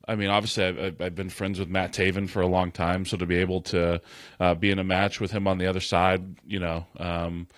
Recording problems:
garbled, watery; slightly

